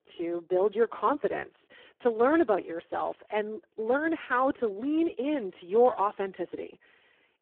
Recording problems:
phone-call audio; poor line

